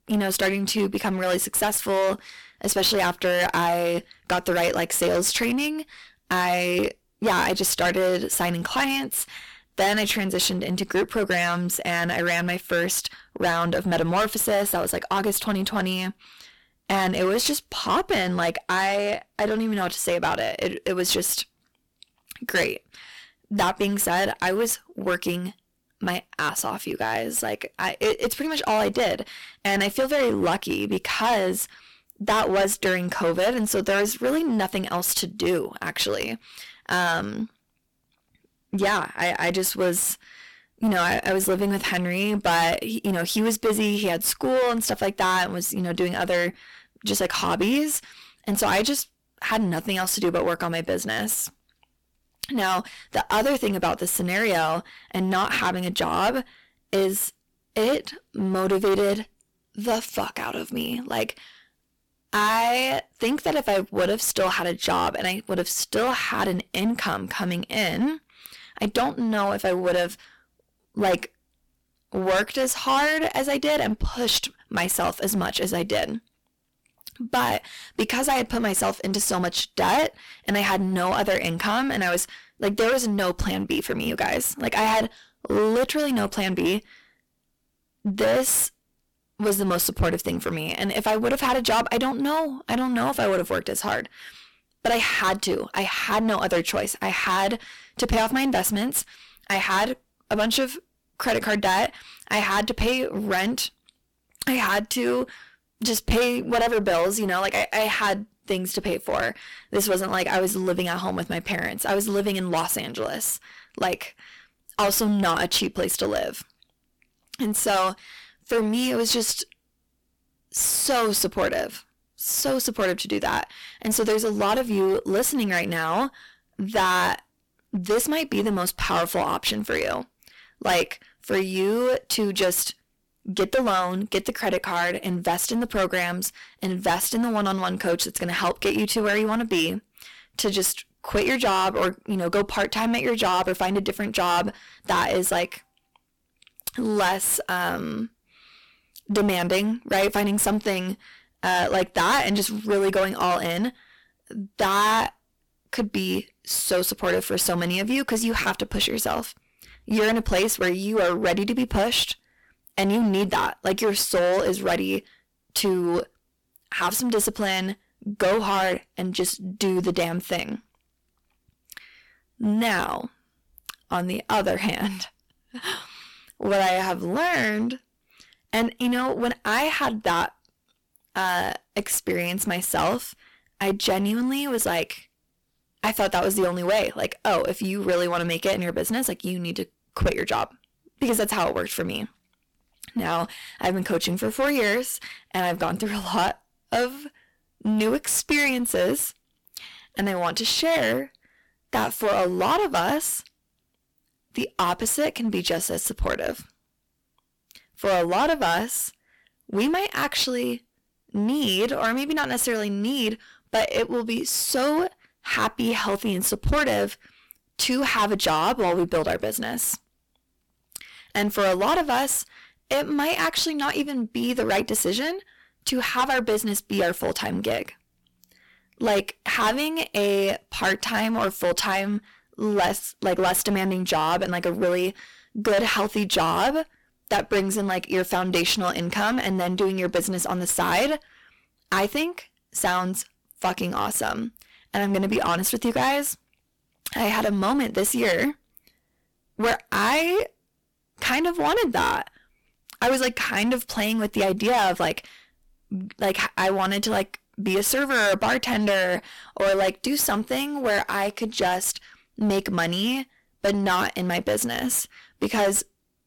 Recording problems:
distortion; heavy; 12% of the sound clipped

